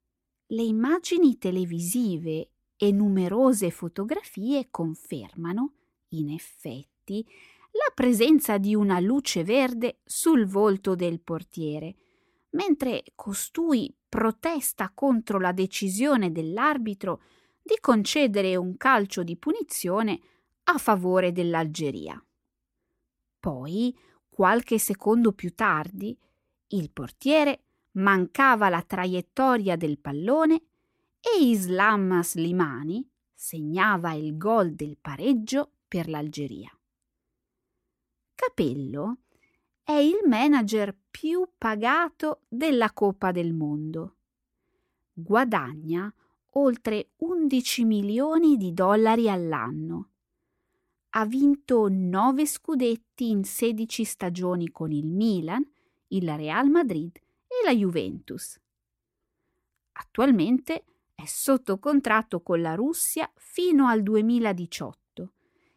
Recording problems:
none

